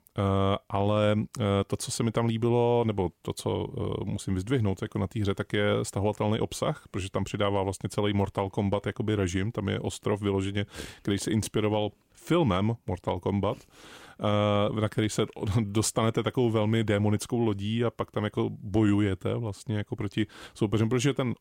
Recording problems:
none

